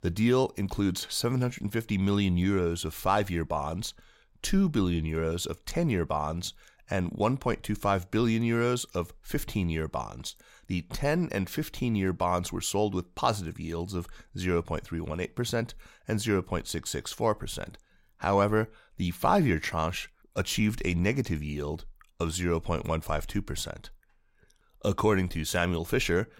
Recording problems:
none

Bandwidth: 16 kHz